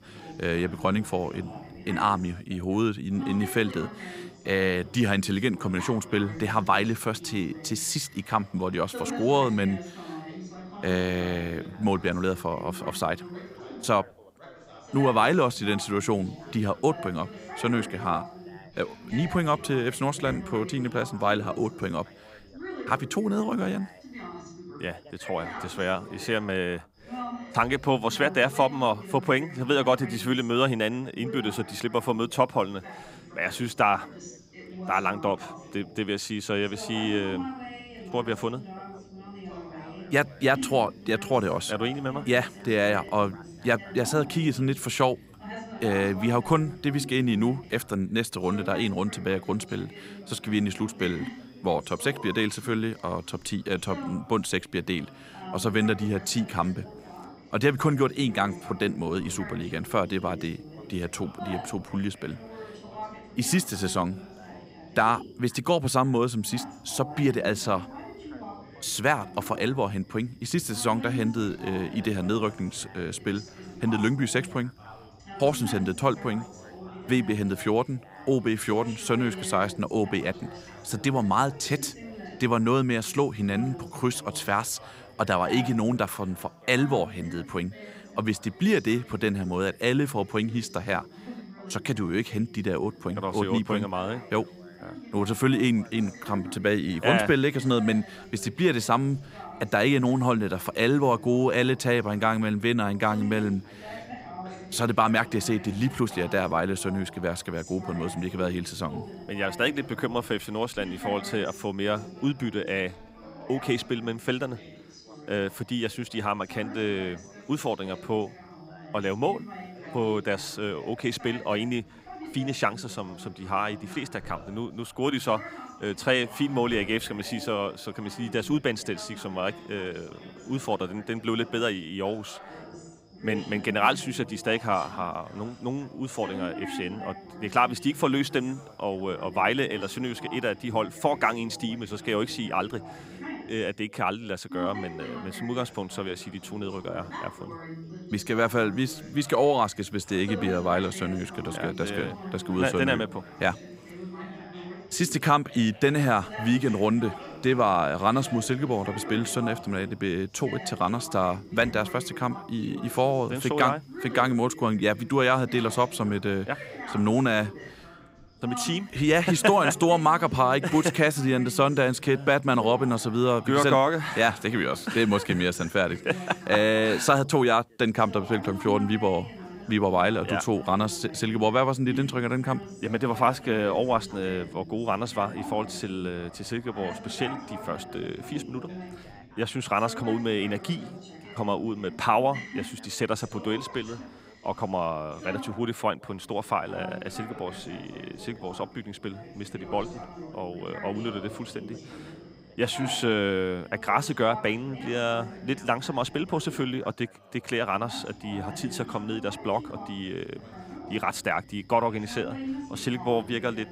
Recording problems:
background chatter; noticeable; throughout; 3 voices, 15 dB below the speech

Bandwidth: 15.5 kHz